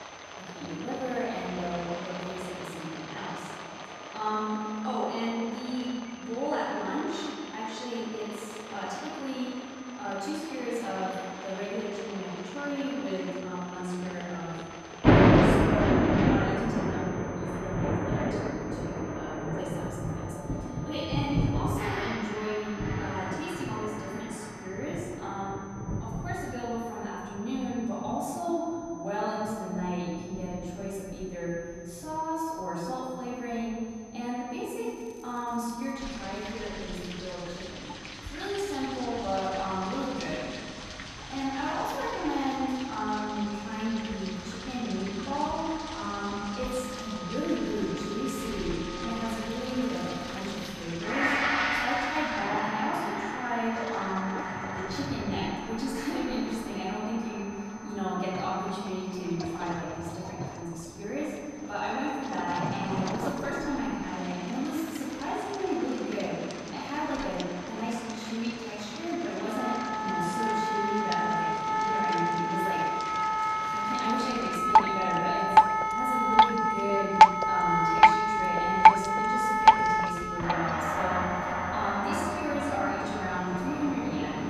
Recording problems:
room echo; strong; dies away in 2 s
off-mic speech; far
background music; very loud; throughout; 3 dB above the speech
rain or running water; very loud; throughout; 3 dB above the speech
high-pitched whine; faint; throughout; 6 kHz, 20 dB below the speech
crackling; faint; from 35 to 36 s and from 49 to 51 s; 25 dB below the speech

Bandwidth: 14 kHz